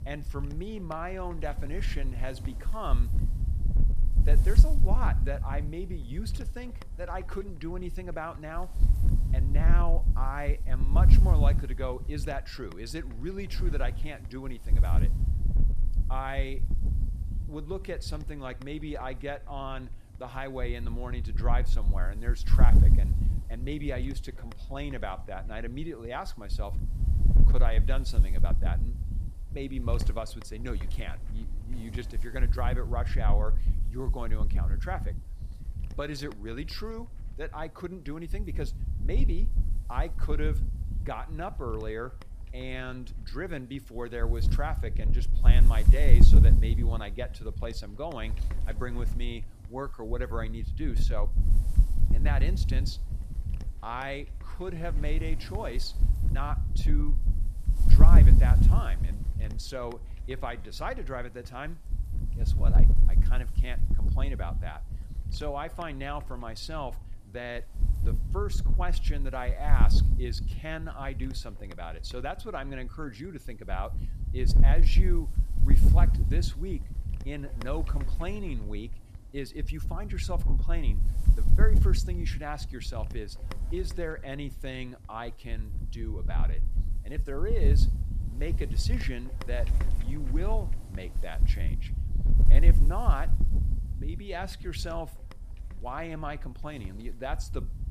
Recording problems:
wind noise on the microphone; heavy; 8 dB below the speech

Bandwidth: 14.5 kHz